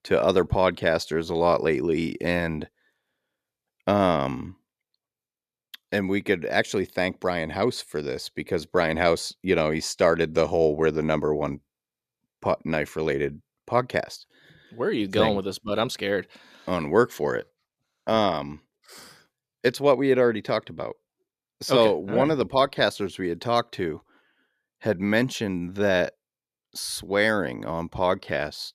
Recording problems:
none

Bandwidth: 14.5 kHz